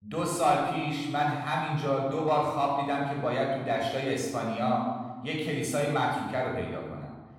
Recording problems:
room echo; noticeable; dies away in 1.2 s
off-mic speech; somewhat distant

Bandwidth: 16.5 kHz